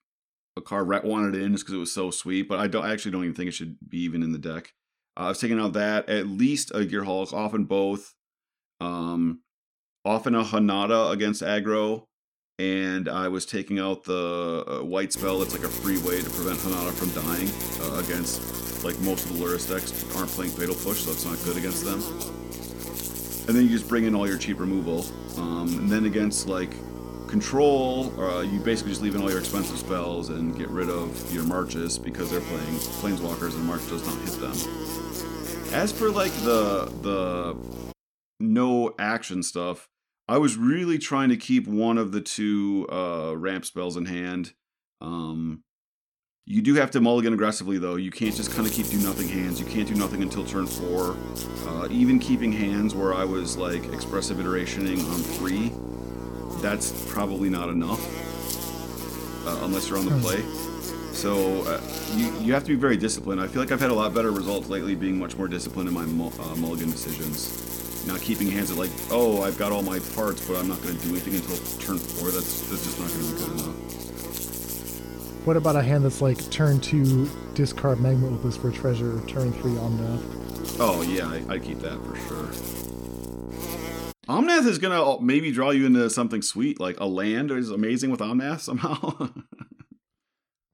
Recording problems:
electrical hum; loud; from 15 to 38 s and from 48 s to 1:24; 60 Hz, 8 dB below the speech

